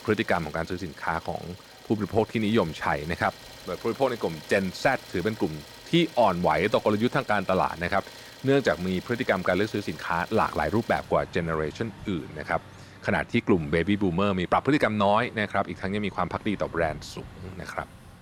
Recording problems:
traffic noise; noticeable; throughout; 20 dB below the speech

